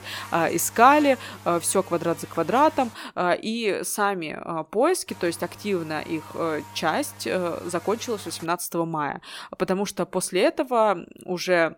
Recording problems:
electrical hum; noticeable; until 3 s and from 5 to 8.5 s; 50 Hz, 20 dB below the speech

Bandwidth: 17.5 kHz